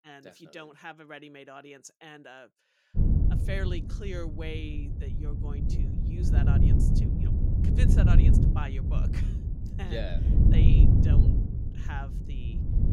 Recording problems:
wind noise on the microphone; heavy; from 3 s on; 3 dB above the speech

